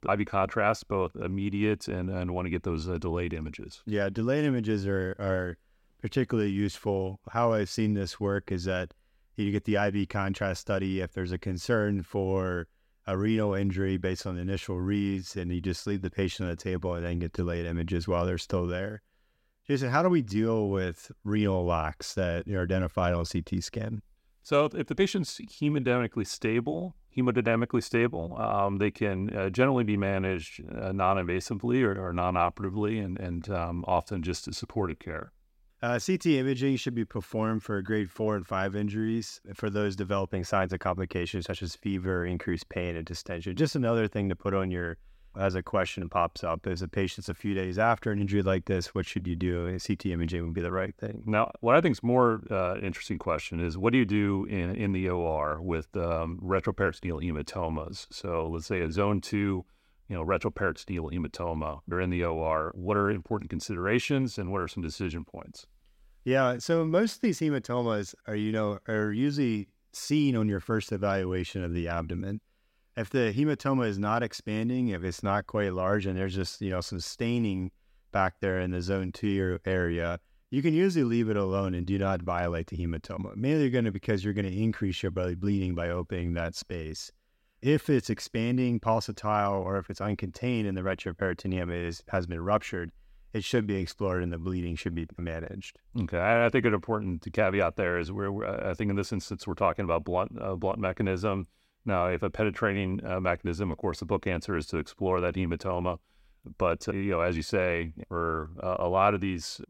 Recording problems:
none

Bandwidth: 16 kHz